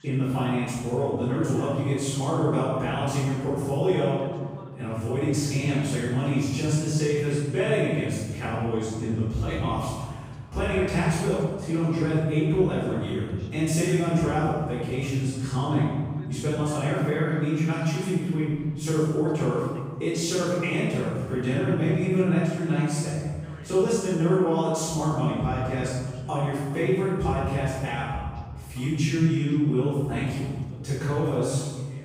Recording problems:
room echo; strong; dies away in 1.5 s
off-mic speech; far
voice in the background; faint; throughout; 20 dB below the speech

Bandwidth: 15.5 kHz